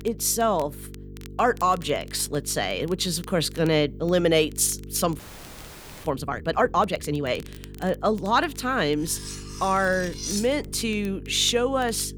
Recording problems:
electrical hum; faint; throughout; 50 Hz, 25 dB below the speech
crackle, like an old record; faint; 25 dB below the speech
audio freezing; at 5 s for 1 s
clattering dishes; noticeable; from 9 to 11 s; peak 6 dB below the speech

